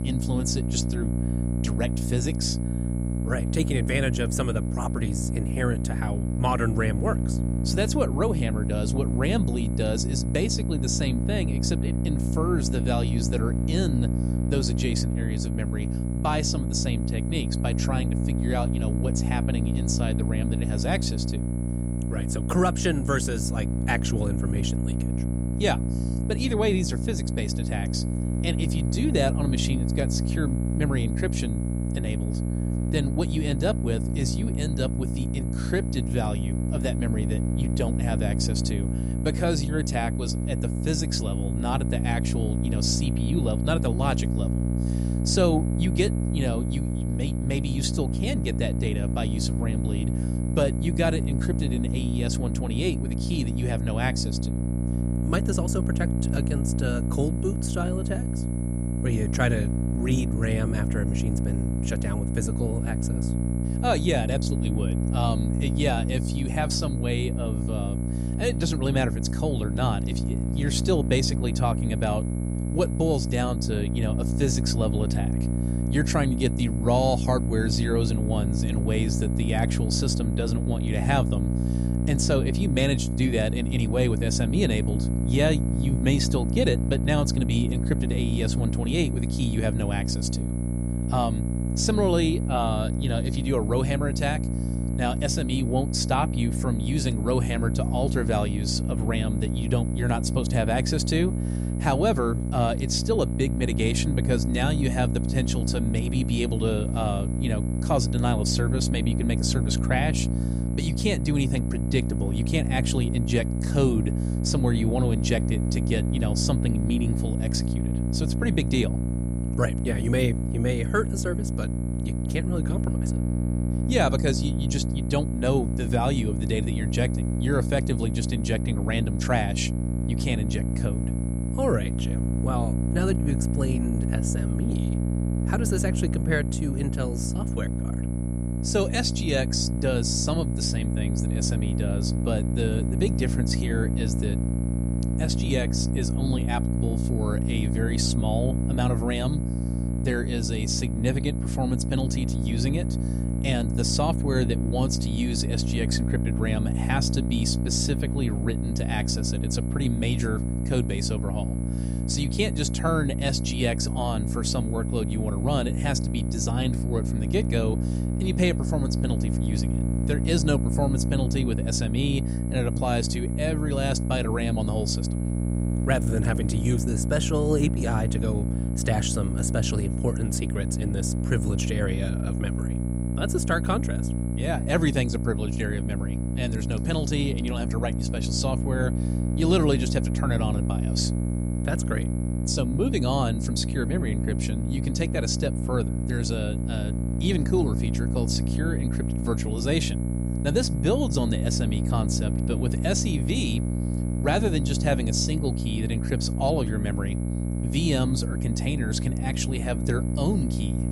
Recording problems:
electrical hum; loud; throughout; 60 Hz, 6 dB below the speech
high-pitched whine; noticeable; throughout; 11 kHz, 20 dB below the speech

